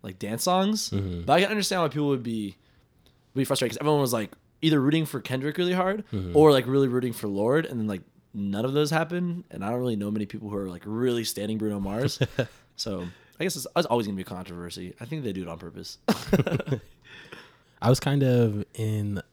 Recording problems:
uneven, jittery; strongly; from 3.5 to 18 s

